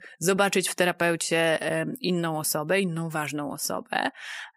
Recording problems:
none

